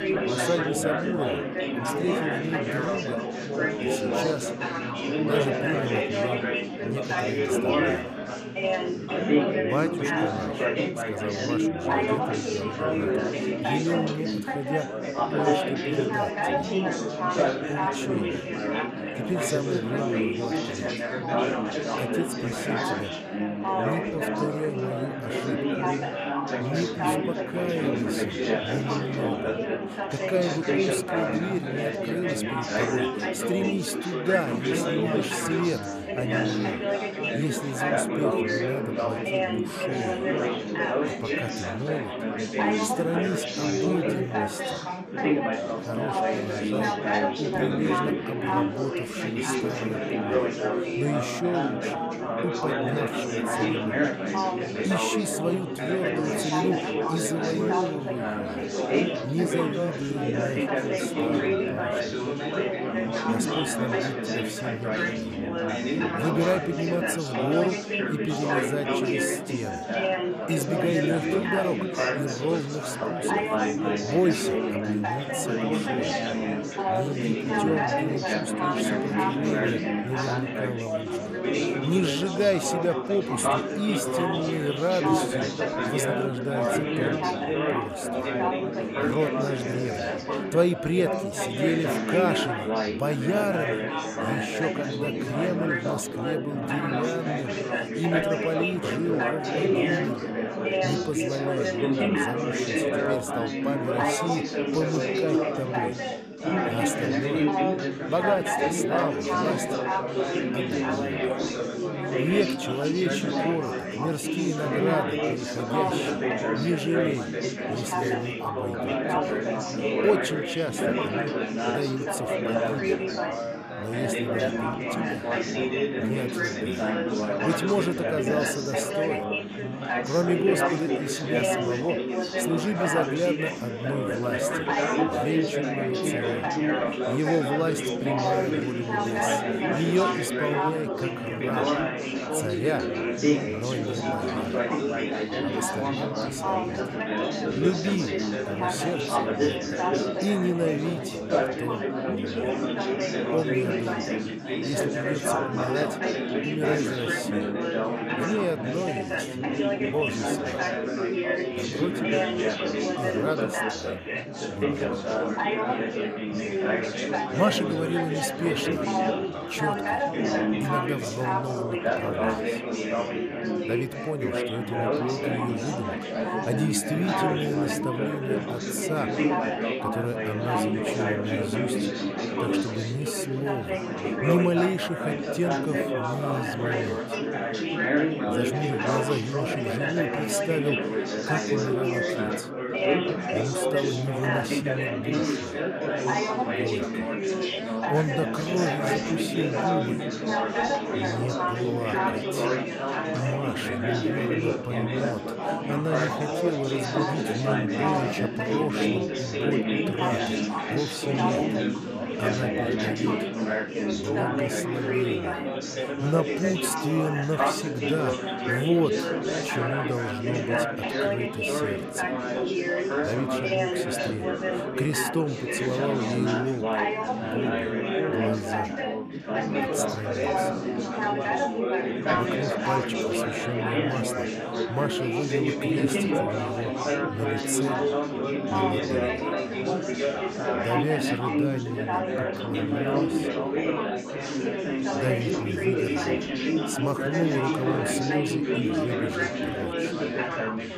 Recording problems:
chatter from many people; very loud; throughout; 4 dB above the speech

